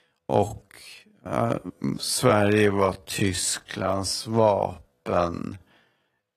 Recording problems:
wrong speed, natural pitch; too slow; 0.5 times normal speed
garbled, watery; slightly; nothing above 14.5 kHz

